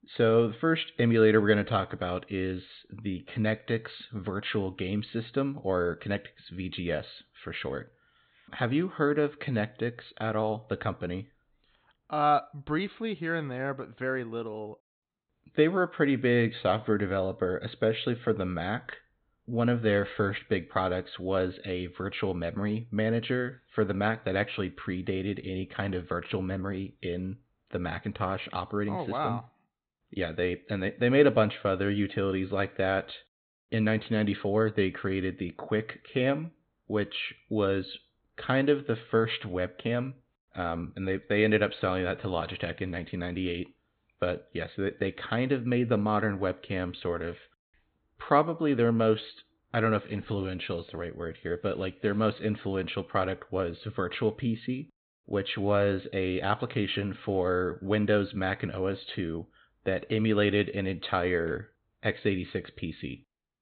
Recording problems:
high frequencies cut off; severe; nothing above 4 kHz

